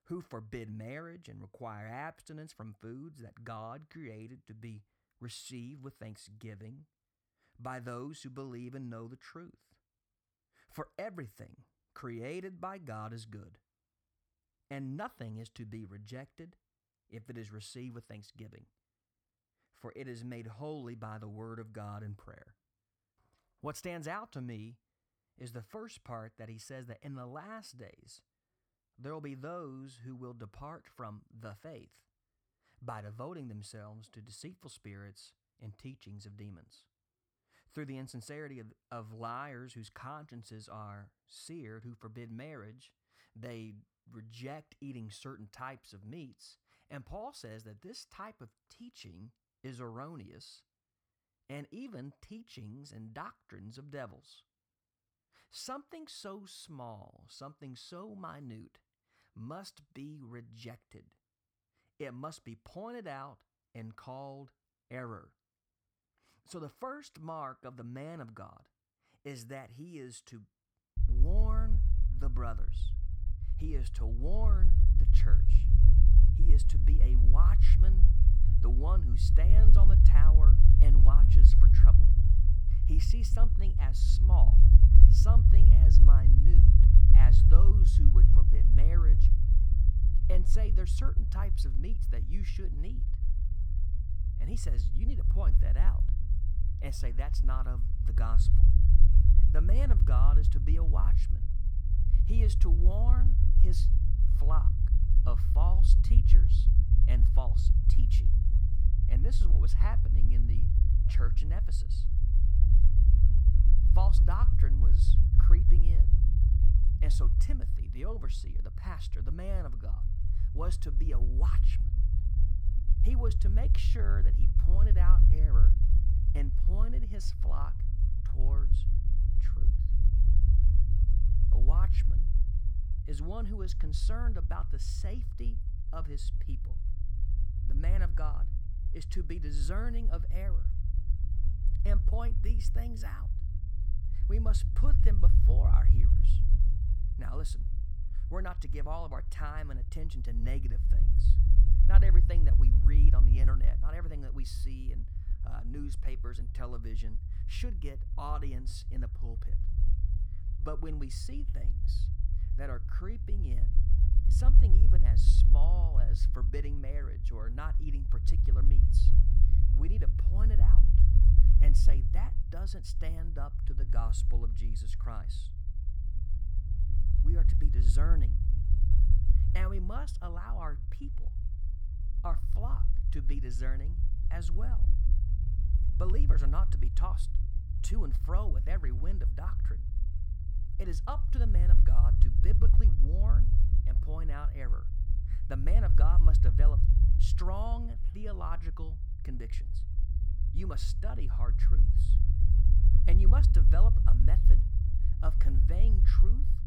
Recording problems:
low rumble; loud; from 1:11 on; 2 dB below the speech

